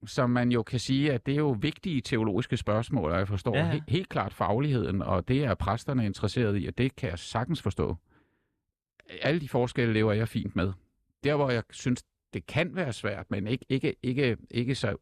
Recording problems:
none

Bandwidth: 14.5 kHz